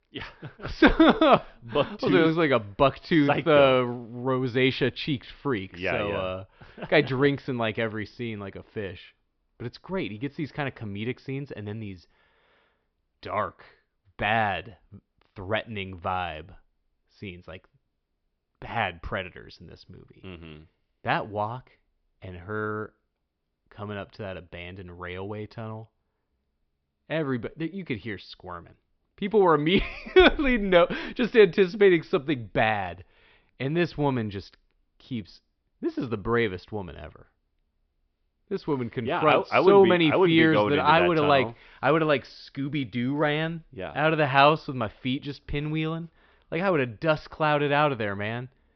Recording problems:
high frequencies cut off; noticeable; nothing above 5.5 kHz

